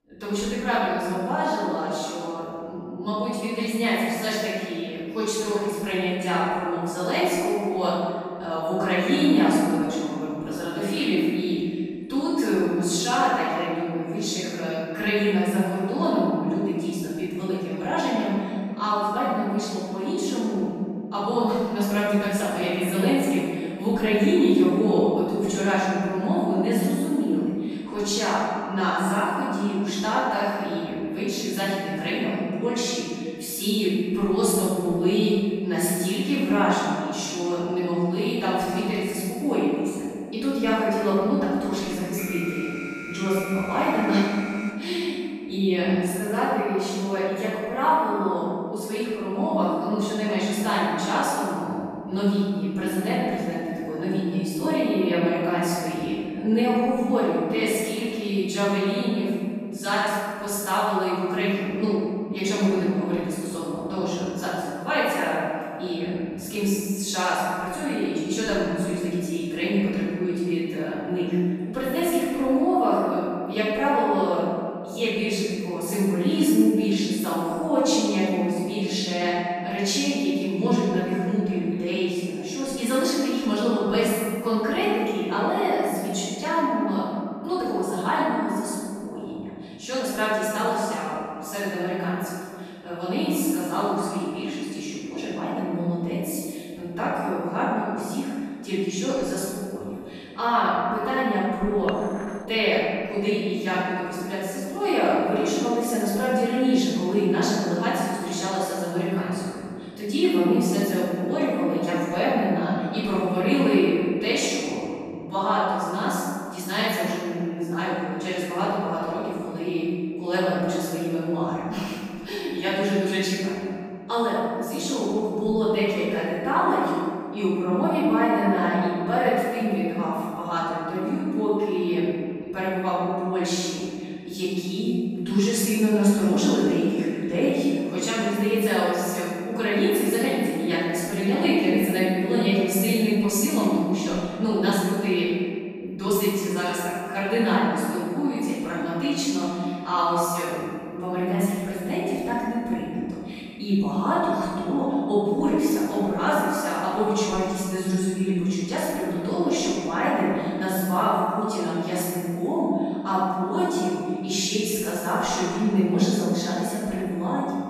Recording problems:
room echo; strong; dies away in 2 s
off-mic speech; far
alarm; noticeable; from 42 to 45 s; peak 9 dB below the speech
clattering dishes; faint; at 1:42; peak 10 dB below the speech

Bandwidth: 15 kHz